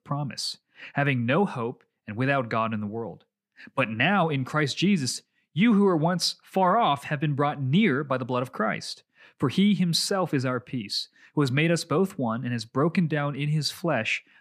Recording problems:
none

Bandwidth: 15 kHz